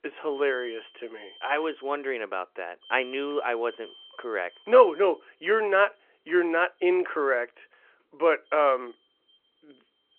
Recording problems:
phone-call audio
alarms or sirens; faint; throughout; 25 dB below the speech

